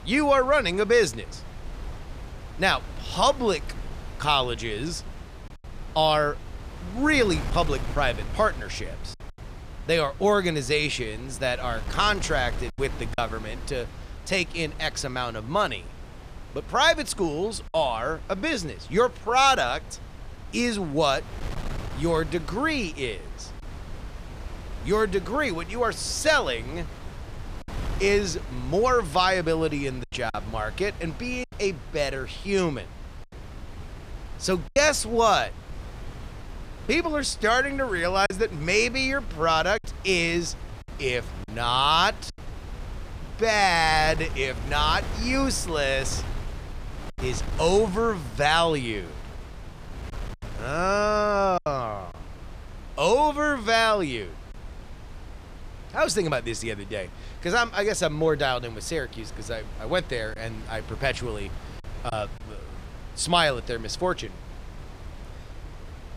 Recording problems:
wind noise on the microphone; occasional gusts; 20 dB below the speech
choppy; occasionally; 2% of the speech affected

